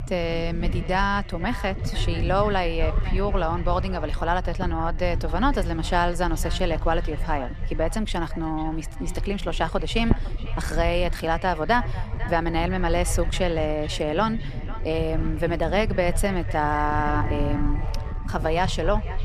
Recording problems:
echo of what is said; noticeable; throughout; 500 ms later, 15 dB below the speech
low rumble; noticeable; throughout; 15 dB below the speech

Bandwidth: 14 kHz